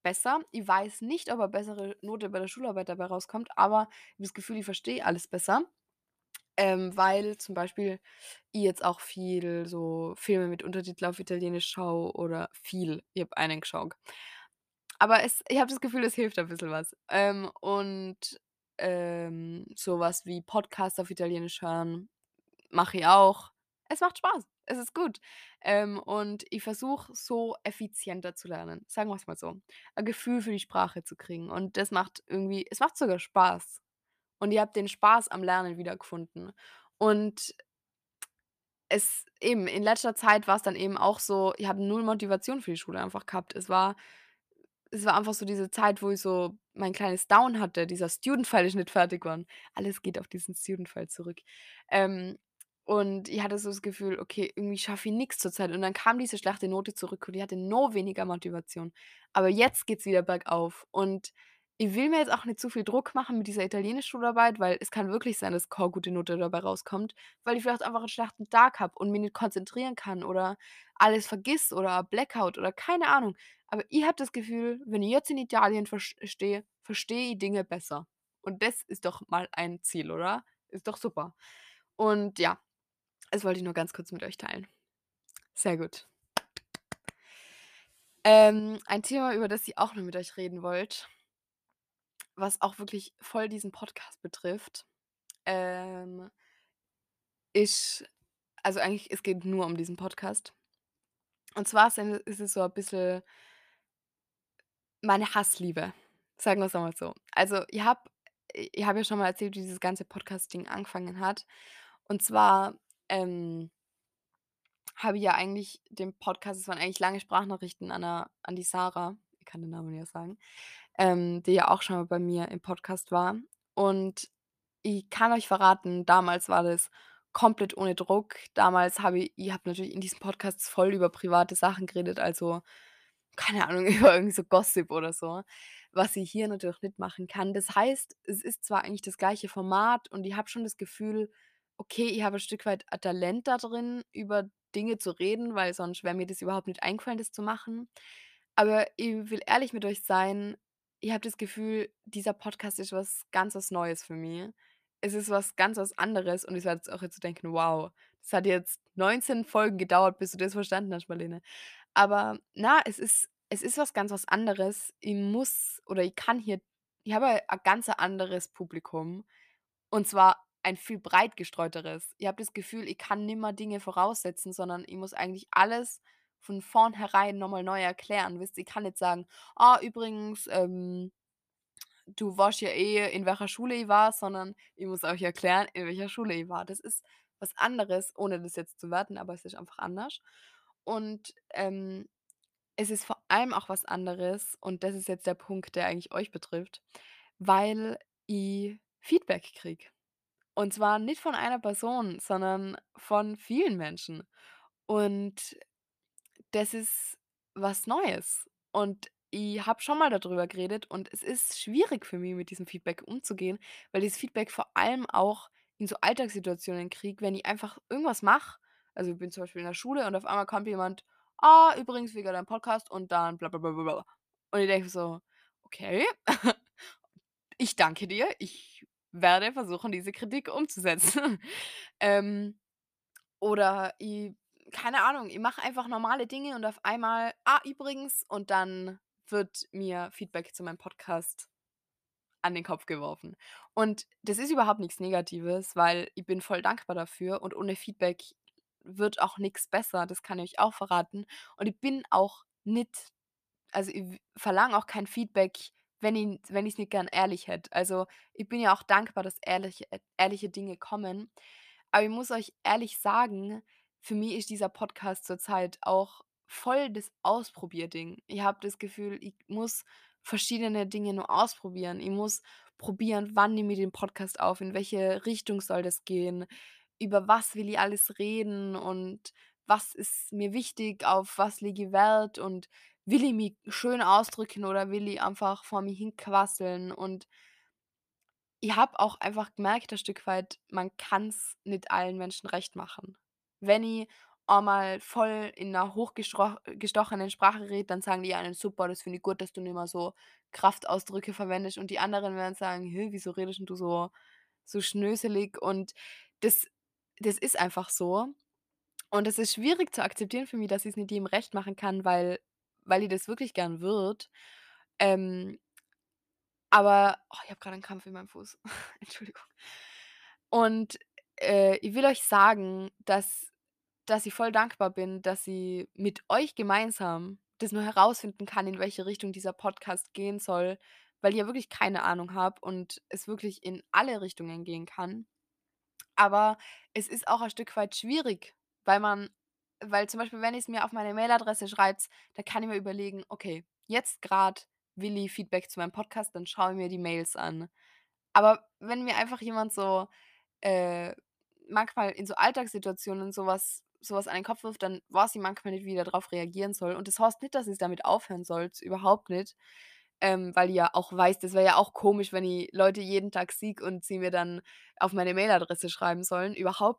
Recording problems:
none

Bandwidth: 14.5 kHz